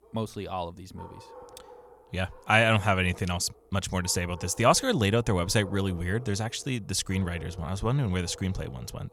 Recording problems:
animal sounds; faint; throughout; 20 dB below the speech

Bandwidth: 18 kHz